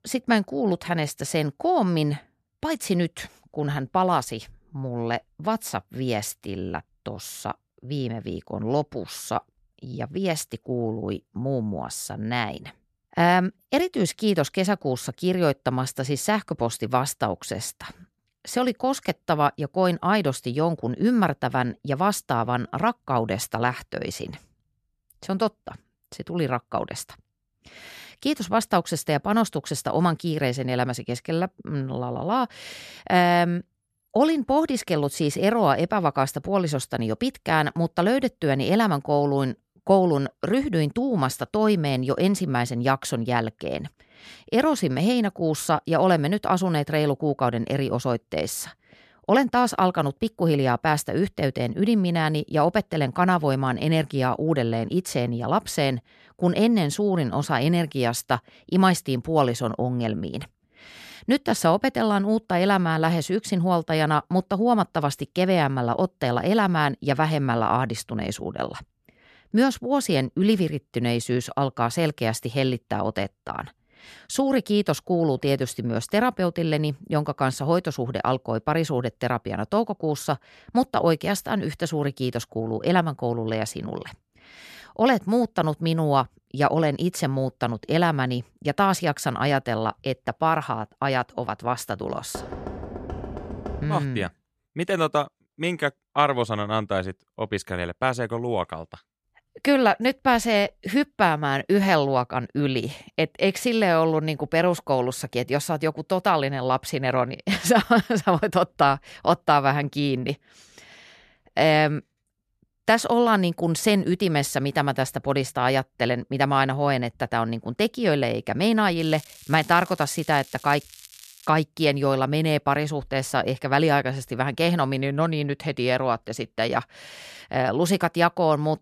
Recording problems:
crackling; faint; from 1:59 to 2:01; 20 dB below the speech
door banging; faint; from 1:32 to 1:34; peak 10 dB below the speech

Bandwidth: 14 kHz